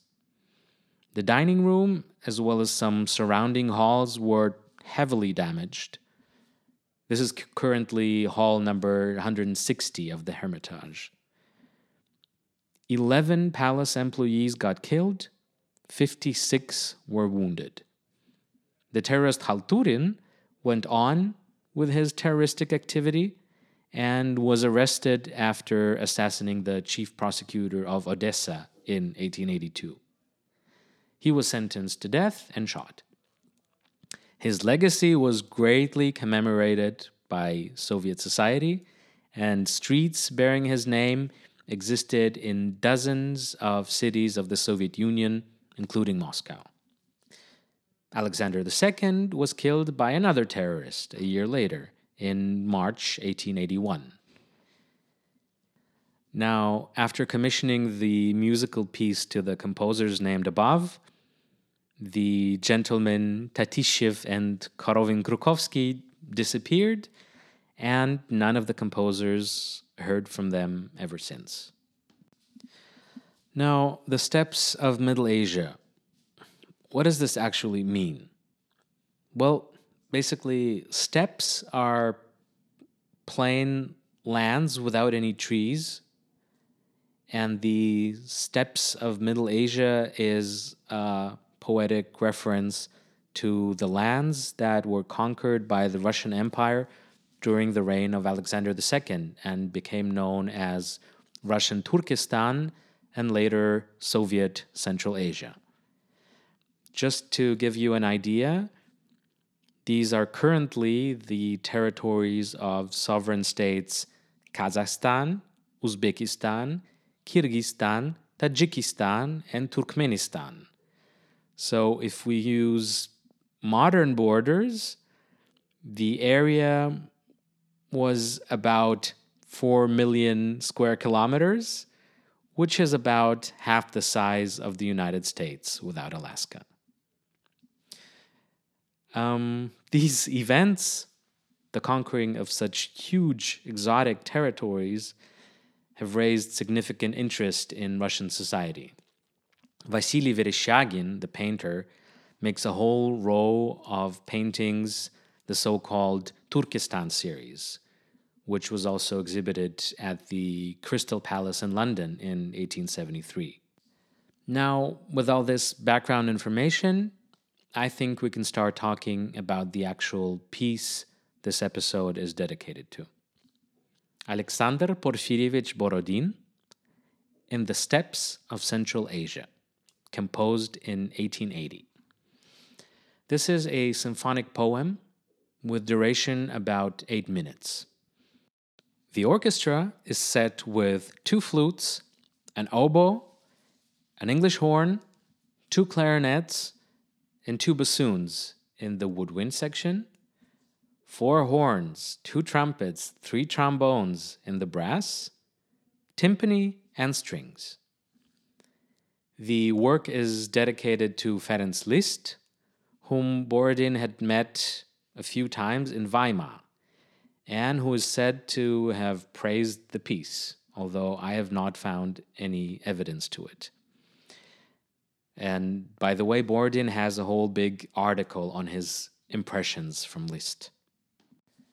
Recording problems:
none

